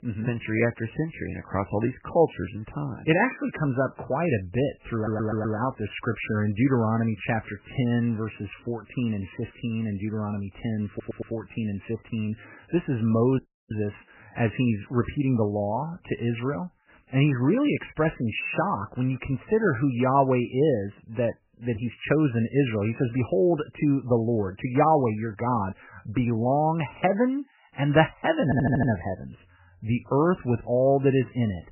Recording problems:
garbled, watery; badly; nothing above 3 kHz
high-pitched whine; very faint; throughout; 1.5 kHz, 85 dB below the speech
audio stuttering; at 5 s, at 11 s and at 28 s
audio cutting out; at 13 s

